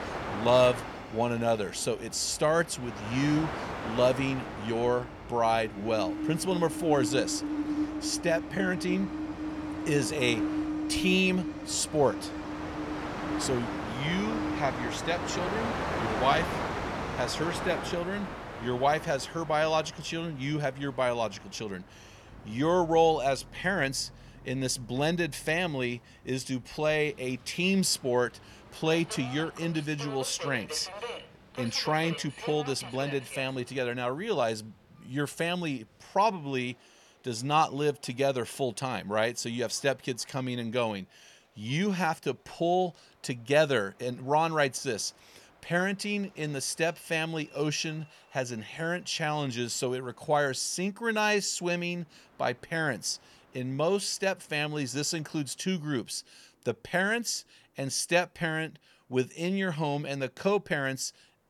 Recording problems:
train or aircraft noise; loud; throughout; 6 dB below the speech

